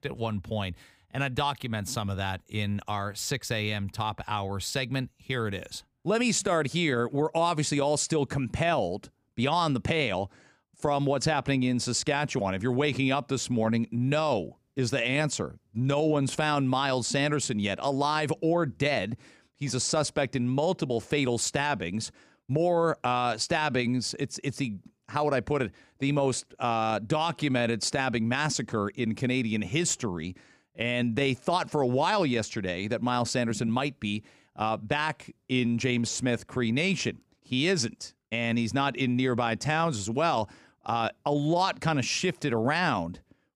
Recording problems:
none

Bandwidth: 15.5 kHz